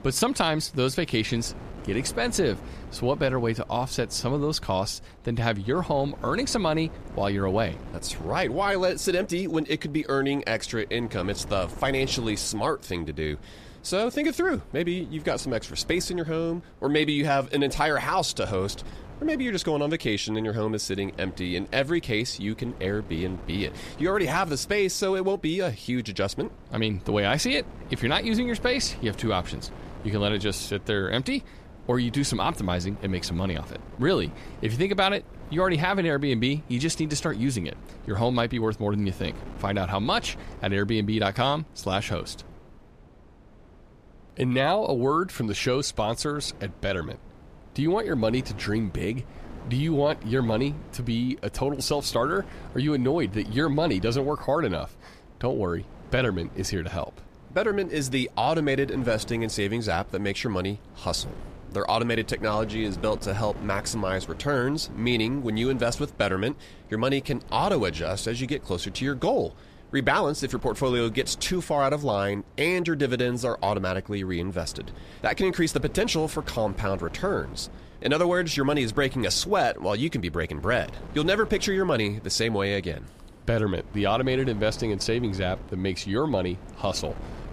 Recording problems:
wind noise on the microphone; occasional gusts; 20 dB below the speech

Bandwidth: 14.5 kHz